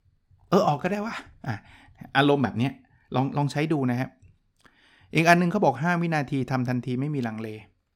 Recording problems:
none

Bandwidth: 17.5 kHz